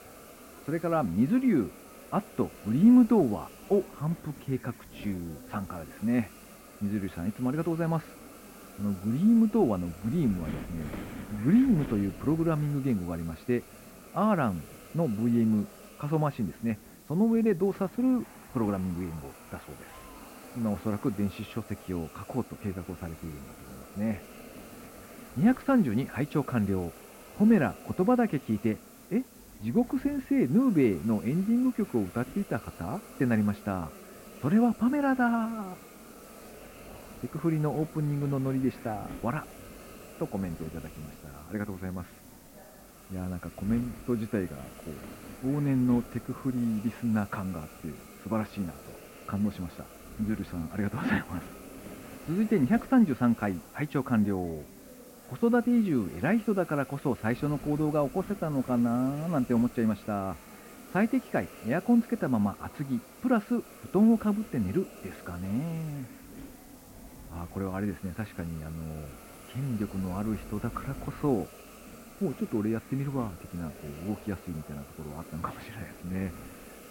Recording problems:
muffled; very; fading above 2 kHz
wind noise on the microphone; occasional gusts; 20 dB below the speech
murmuring crowd; faint; throughout; 25 dB below the speech
hiss; faint; throughout; 20 dB below the speech

